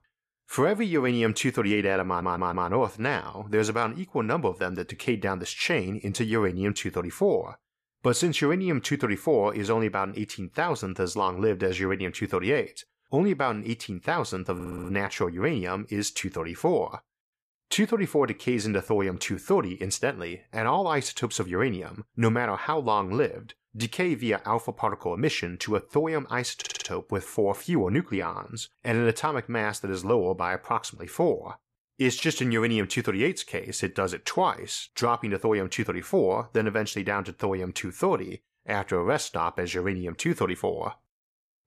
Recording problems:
audio stuttering; at 2 s, at 15 s and at 27 s

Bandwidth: 14.5 kHz